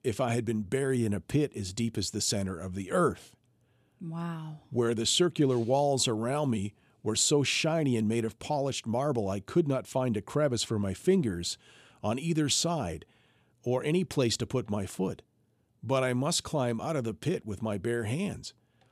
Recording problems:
none

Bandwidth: 14.5 kHz